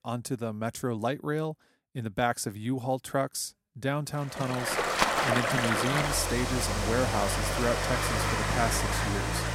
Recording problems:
rain or running water; very loud; from 4.5 s on; 3 dB above the speech

